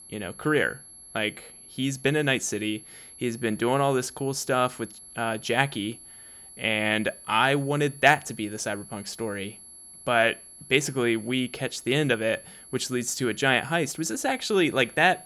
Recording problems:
high-pitched whine; noticeable; throughout; 11 kHz, 20 dB below the speech

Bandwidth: 17 kHz